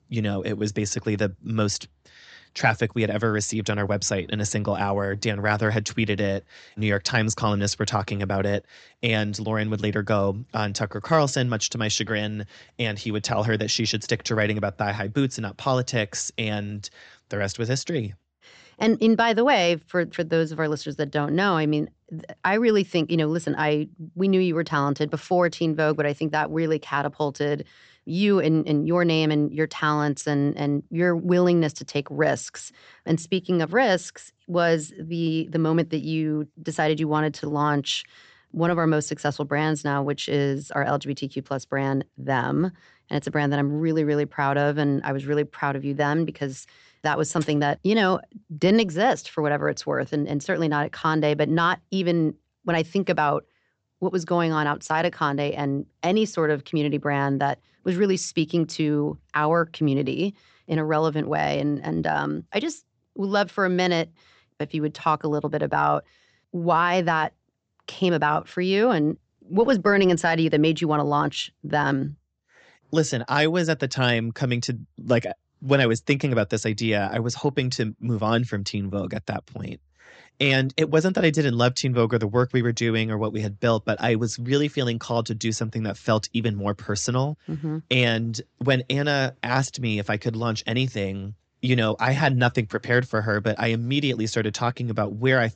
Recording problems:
high frequencies cut off; noticeable; nothing above 8 kHz

